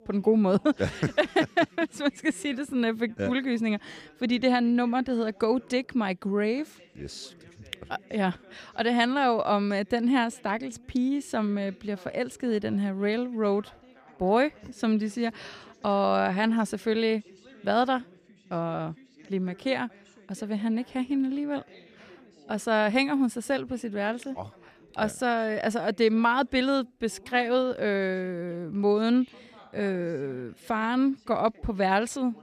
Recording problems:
background chatter; faint; throughout; 2 voices, 25 dB below the speech

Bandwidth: 14.5 kHz